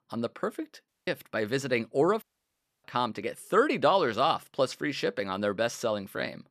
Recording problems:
audio cutting out; at 1 s and at 2 s for 0.5 s

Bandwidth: 14.5 kHz